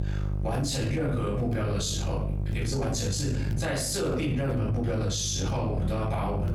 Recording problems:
off-mic speech; far
room echo; noticeable; dies away in 0.6 s
squashed, flat; somewhat
electrical hum; noticeable; throughout; 50 Hz, 15 dB below the speech

